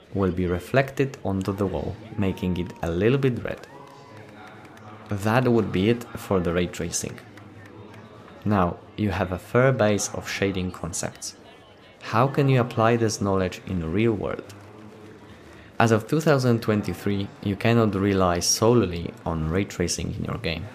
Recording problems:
murmuring crowd; faint; throughout; 20 dB below the speech

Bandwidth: 15 kHz